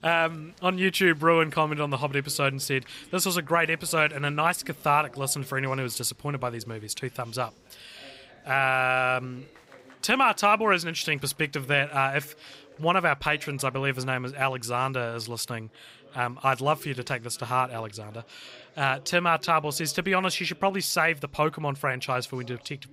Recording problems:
chatter from many people; faint; throughout; 25 dB below the speech

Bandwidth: 15.5 kHz